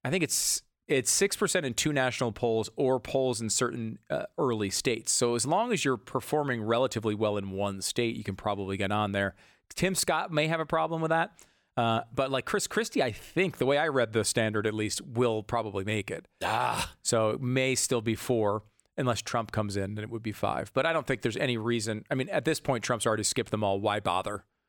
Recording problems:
none

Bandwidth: 18 kHz